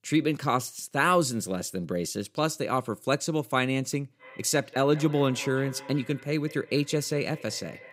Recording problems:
echo of what is said; faint; from 4 s on; 190 ms later, 20 dB below the speech

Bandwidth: 15.5 kHz